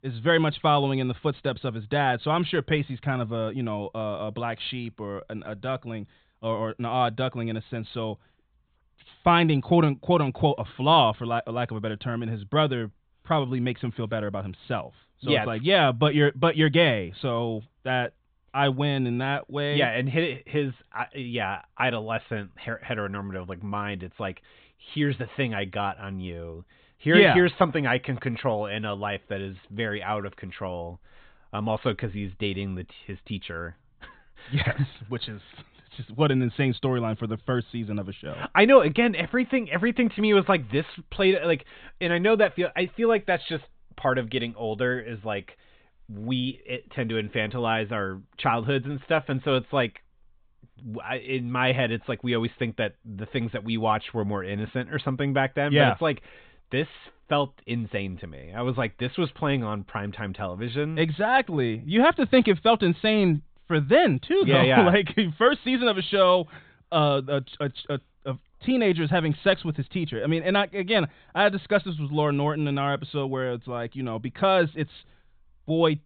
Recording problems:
high frequencies cut off; severe; nothing above 4 kHz

